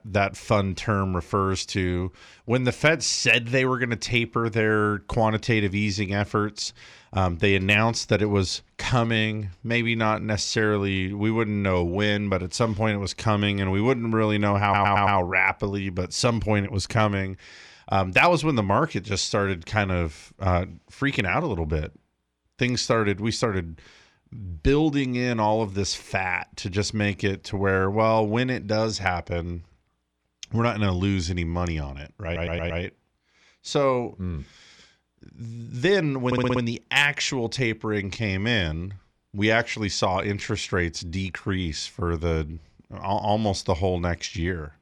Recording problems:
audio stuttering; at 15 s, at 32 s and at 36 s

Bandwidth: 18.5 kHz